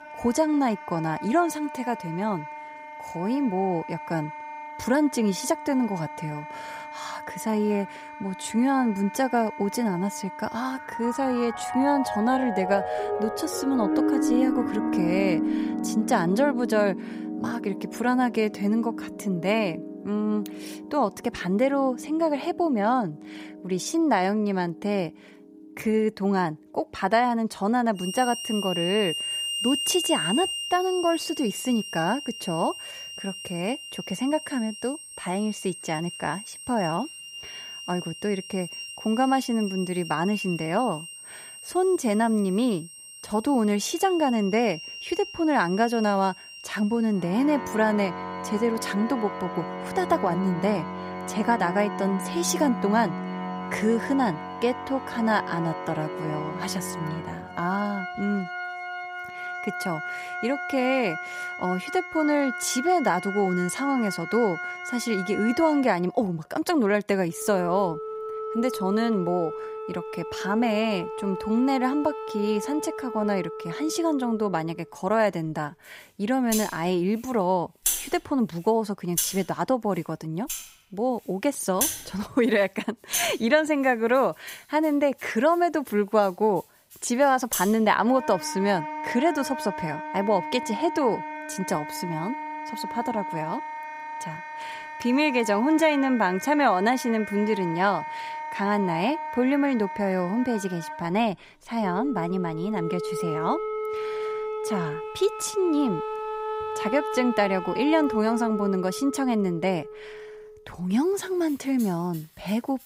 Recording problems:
background music; loud; throughout; 7 dB below the speech

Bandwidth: 15.5 kHz